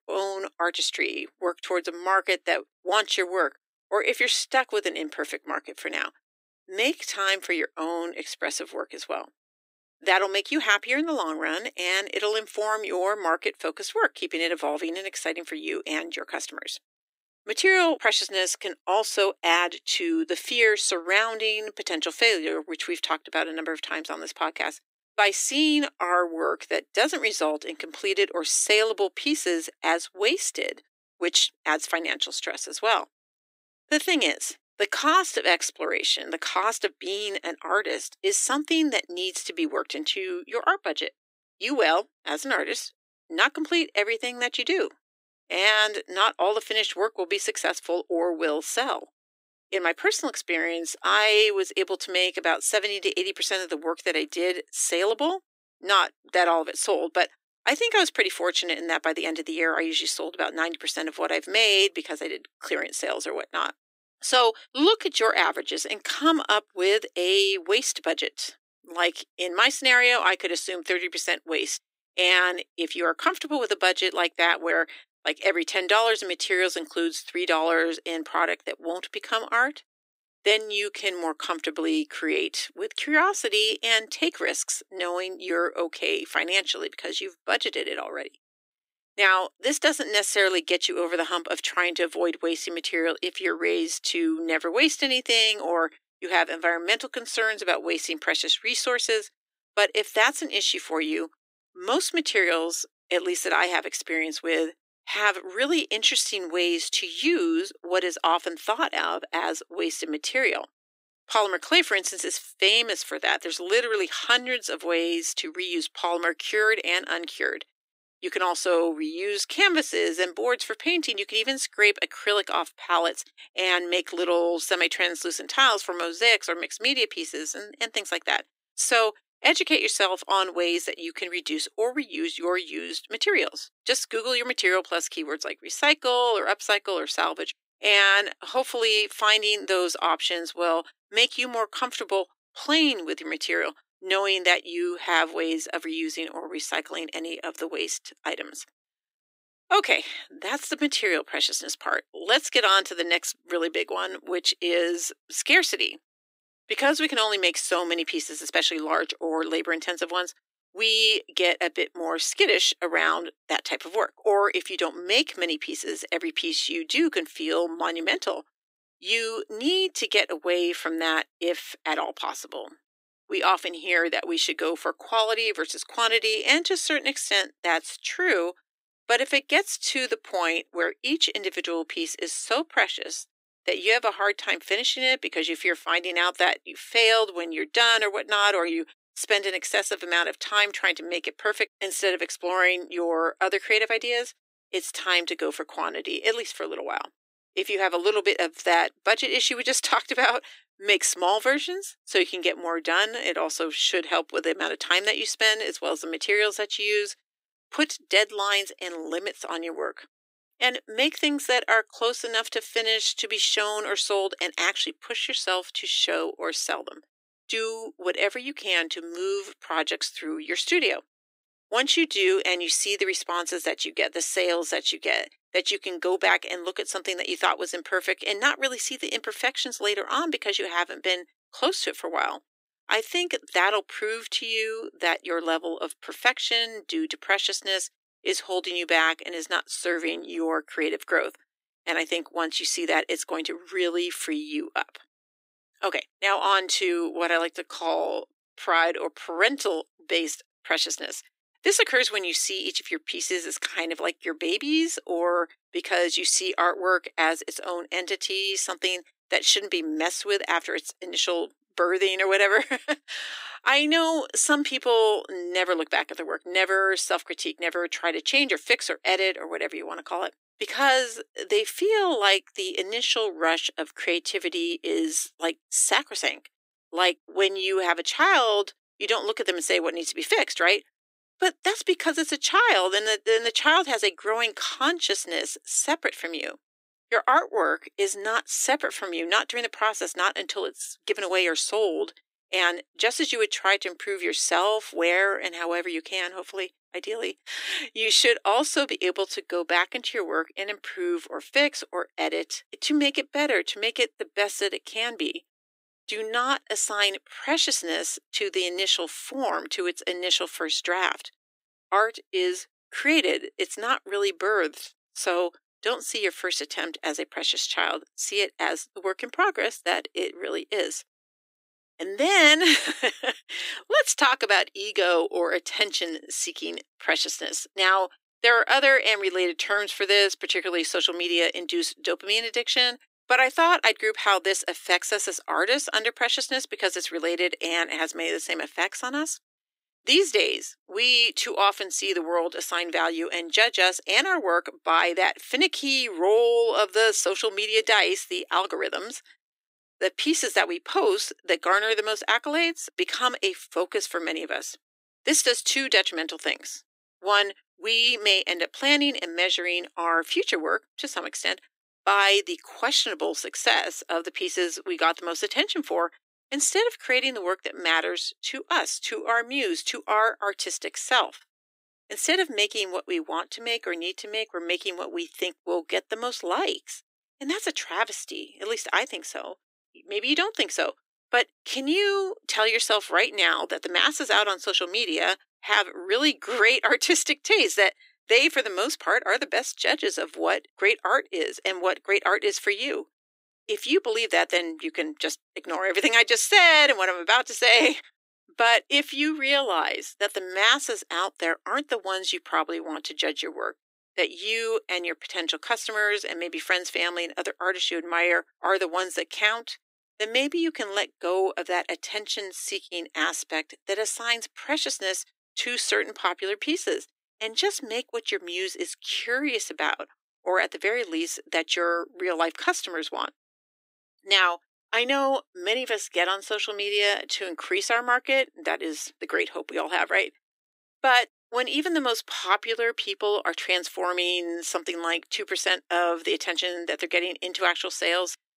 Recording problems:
thin; very; fading below 300 Hz

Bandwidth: 15.5 kHz